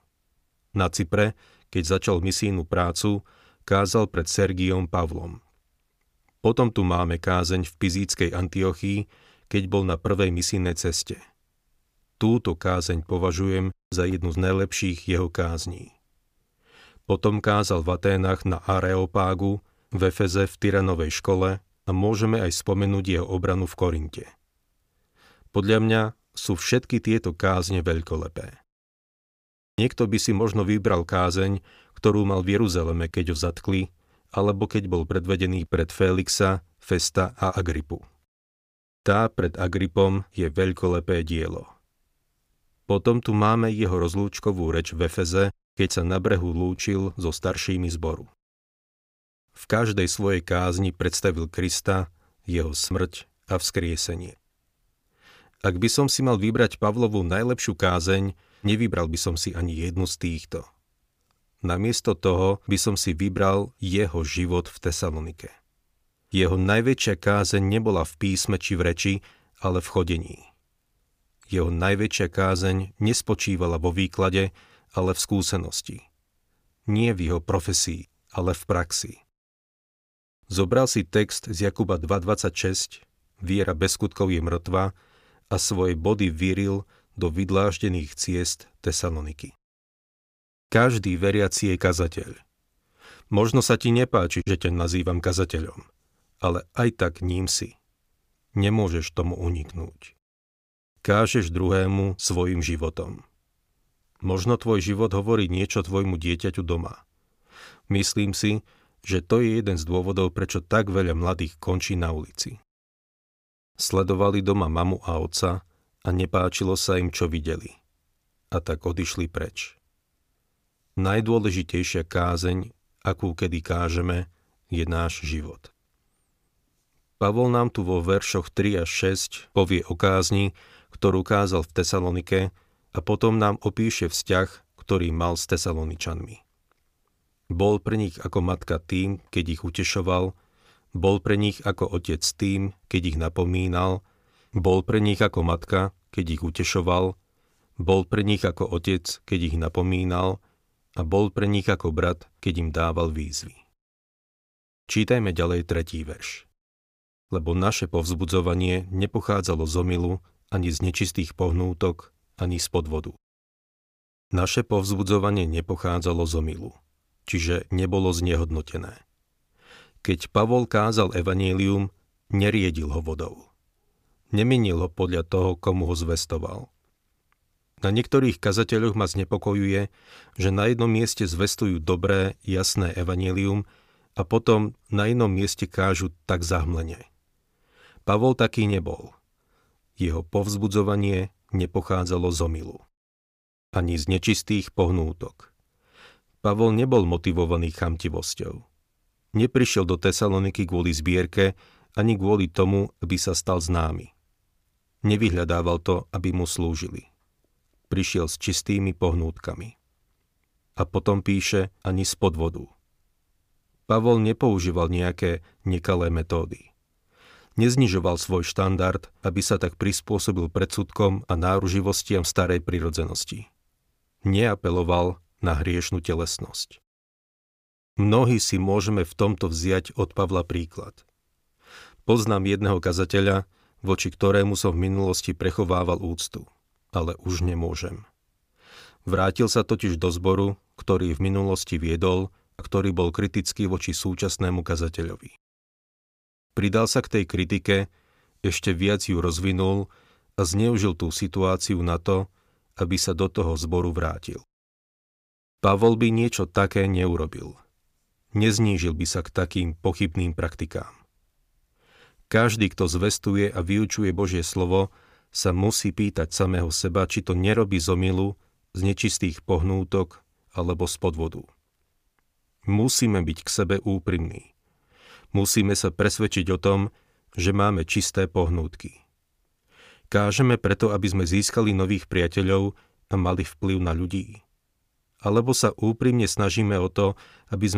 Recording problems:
abrupt cut into speech; at the end

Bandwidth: 15 kHz